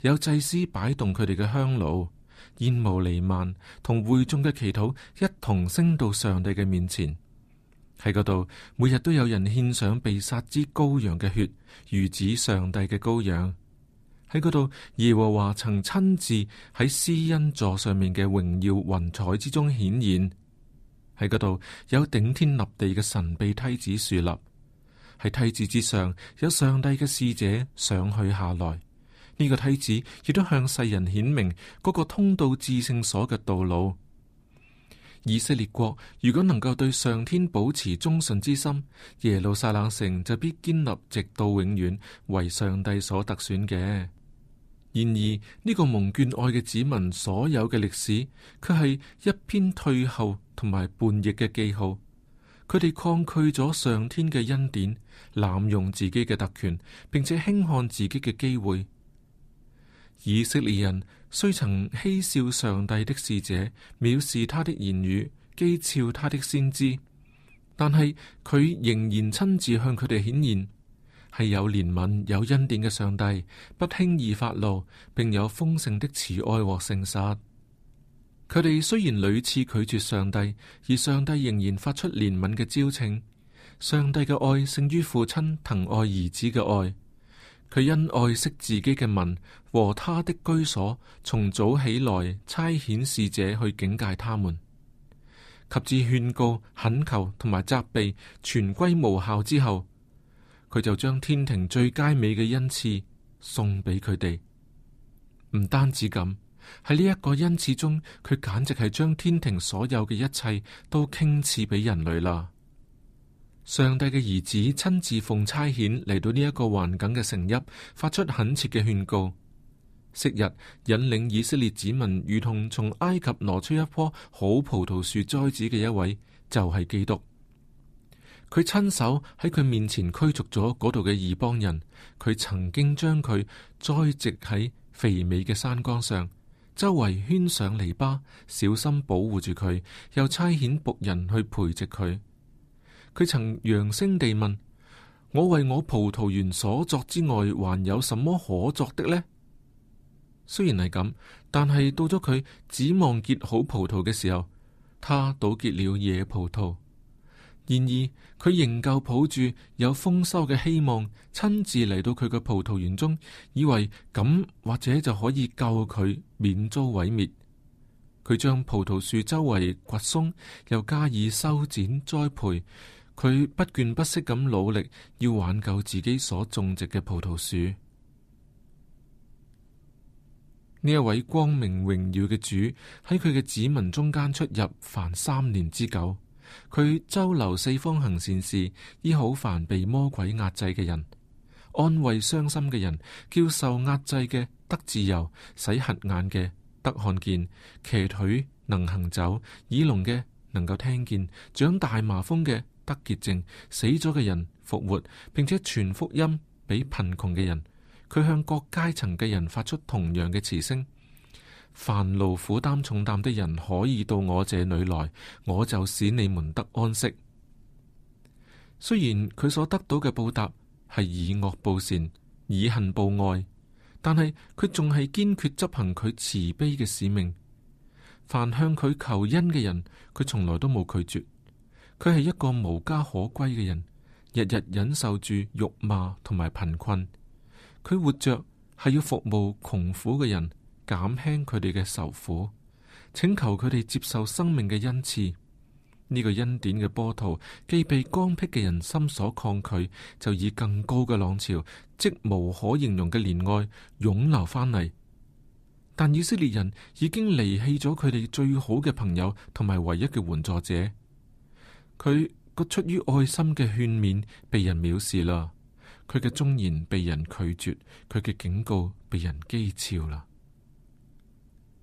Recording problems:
none

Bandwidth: 14.5 kHz